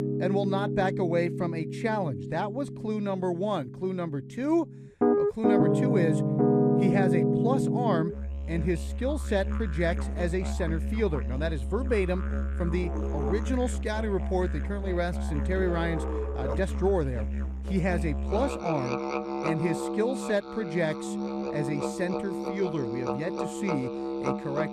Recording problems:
background music; very loud; throughout; 1 dB above the speech

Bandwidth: 13.5 kHz